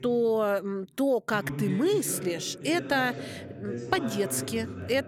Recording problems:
voice in the background; loud; throughout; 9 dB below the speech

